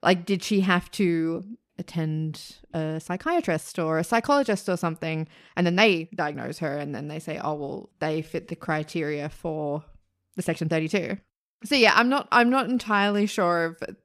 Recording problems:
uneven, jittery; strongly; from 2.5 to 13 s

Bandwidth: 14.5 kHz